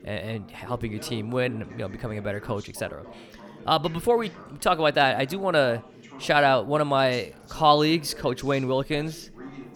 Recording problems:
background chatter; noticeable; throughout; 3 voices, 20 dB below the speech

